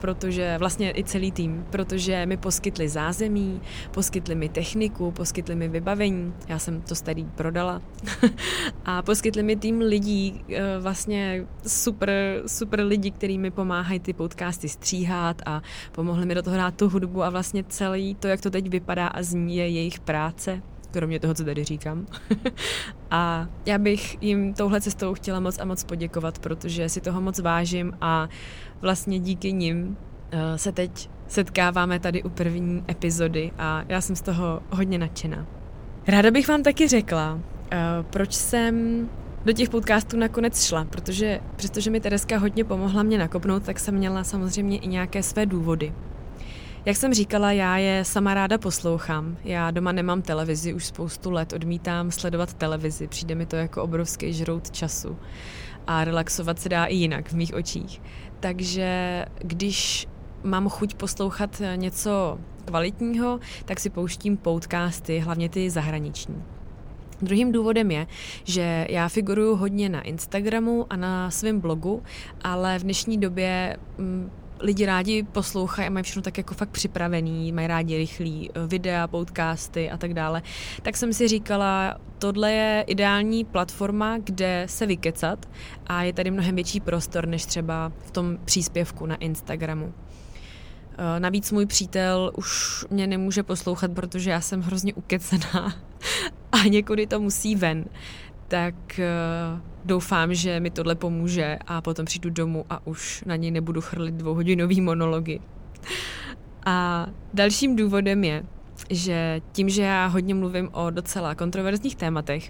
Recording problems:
wind noise on the microphone; occasional gusts; 25 dB below the speech

